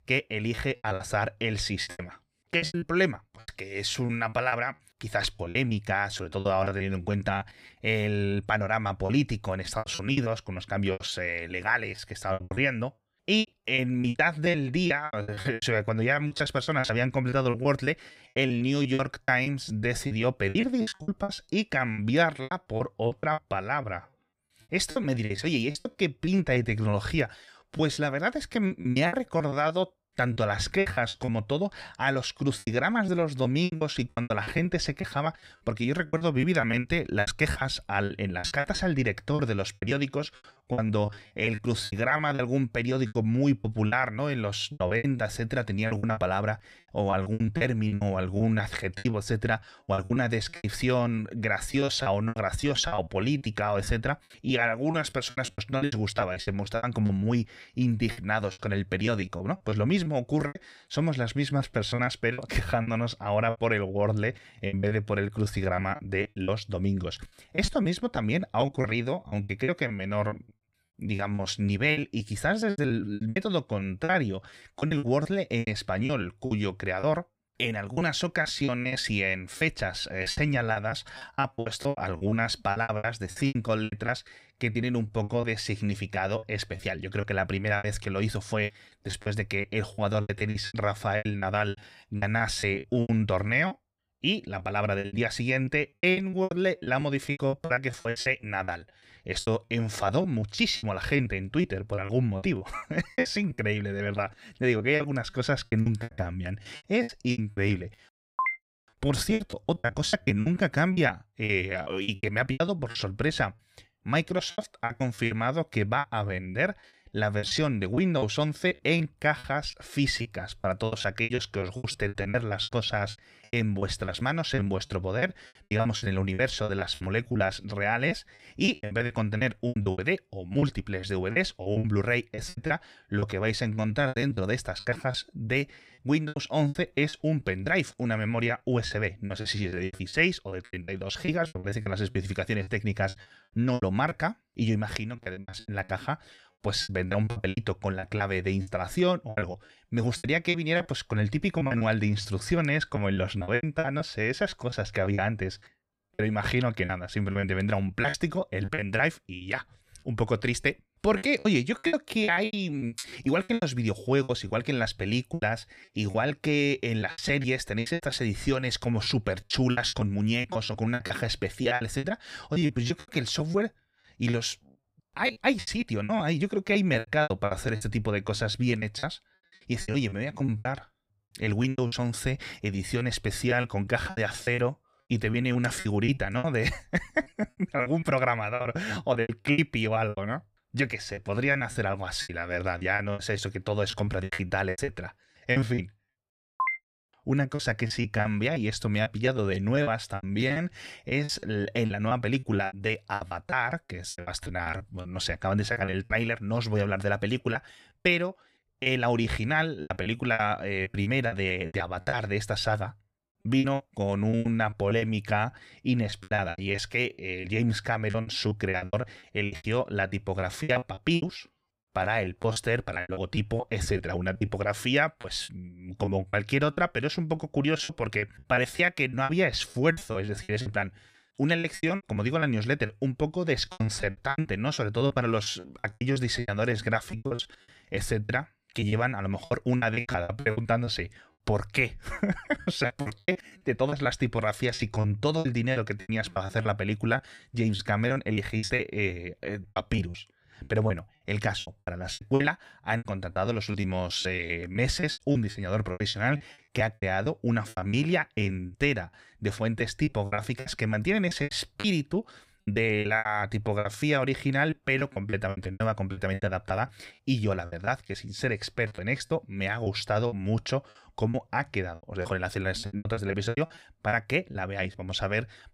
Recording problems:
choppy; very; 16% of the speech affected

